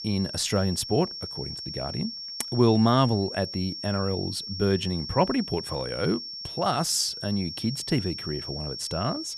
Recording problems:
high-pitched whine; loud; throughout; 5.5 kHz, 7 dB below the speech

